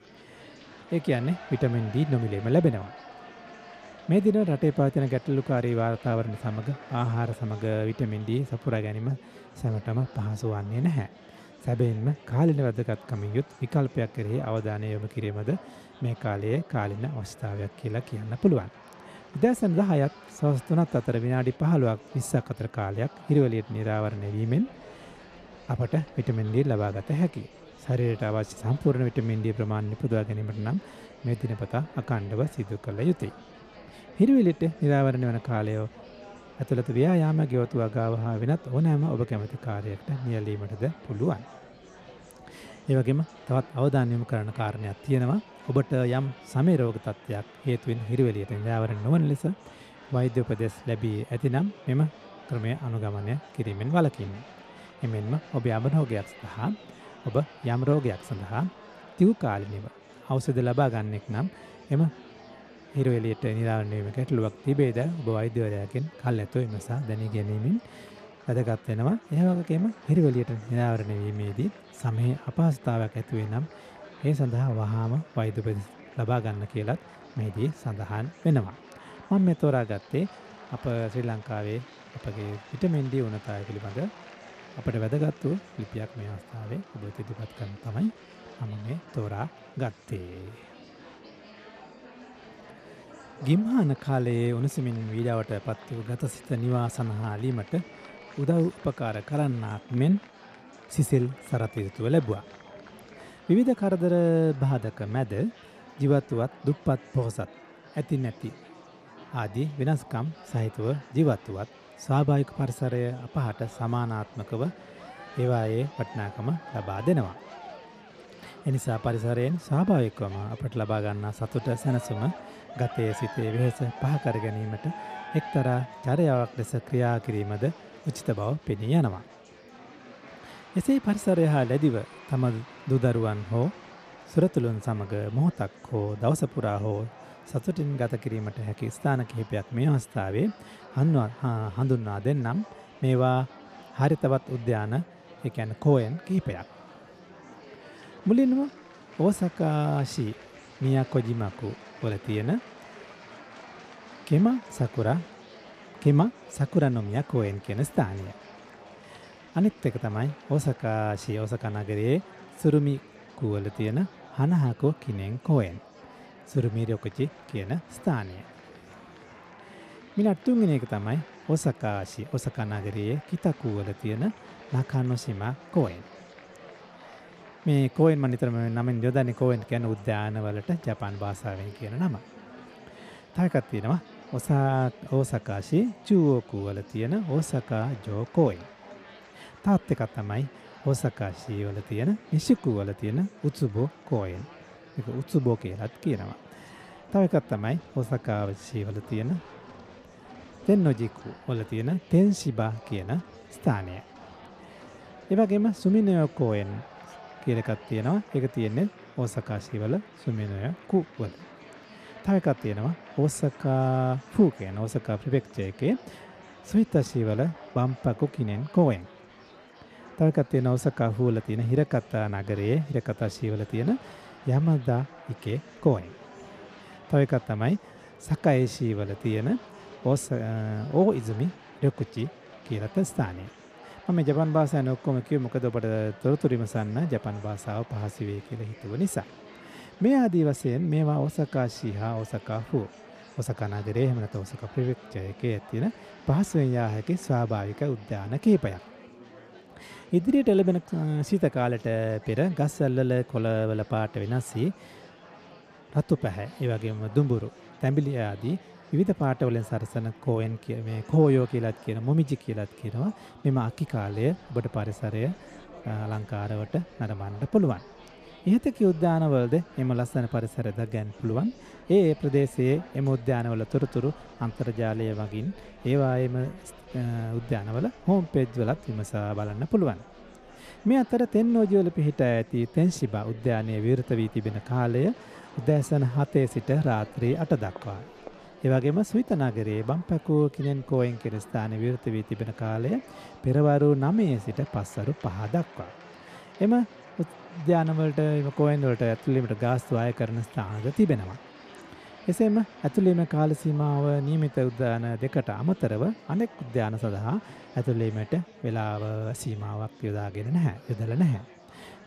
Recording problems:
murmuring crowd; faint; throughout; 20 dB below the speech

